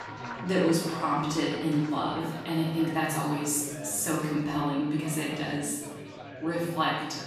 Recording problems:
off-mic speech; far
room echo; noticeable; dies away in 1 s
chatter from many people; noticeable; throughout; 15 dB below the speech
background music; faint; throughout; 20 dB below the speech

